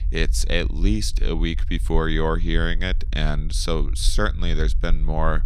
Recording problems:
low rumble; faint; throughout; 25 dB below the speech

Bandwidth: 14.5 kHz